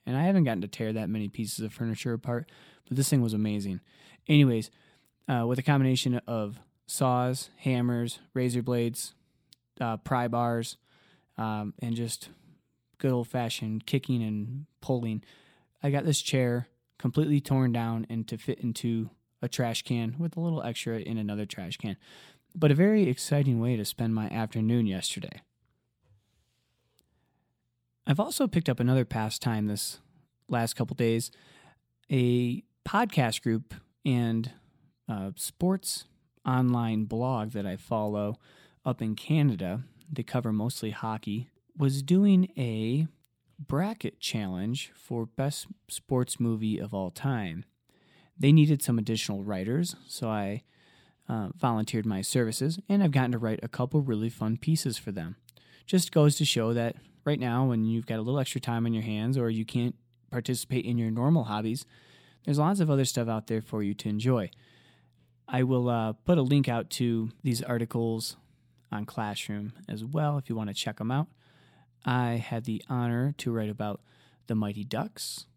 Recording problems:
none

